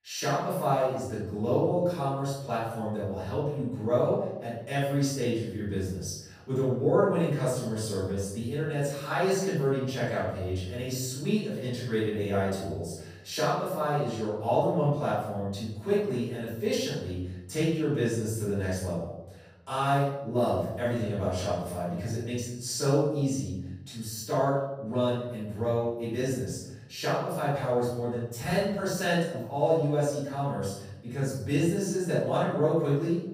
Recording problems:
room echo; strong; dies away in 0.9 s
off-mic speech; far

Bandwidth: 15.5 kHz